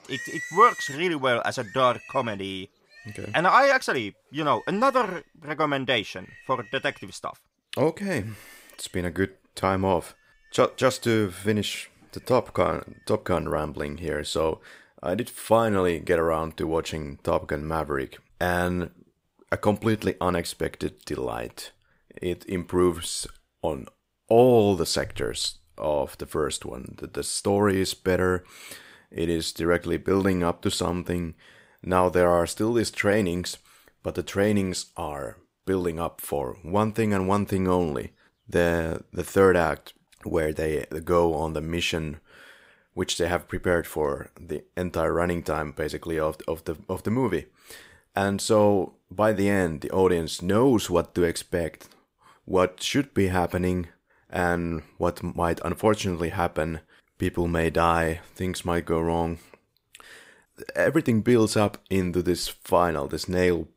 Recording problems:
animal sounds; noticeable; throughout; 15 dB below the speech

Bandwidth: 15.5 kHz